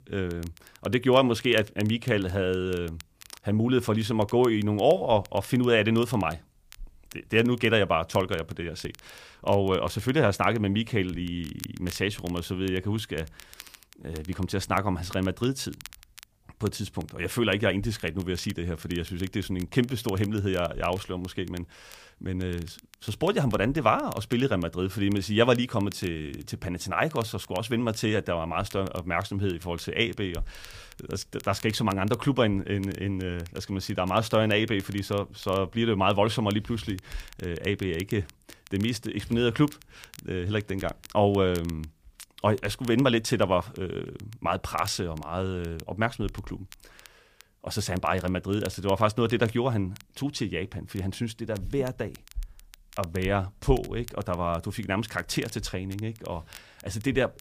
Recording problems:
crackle, like an old record; faint; 20 dB below the speech

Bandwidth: 15 kHz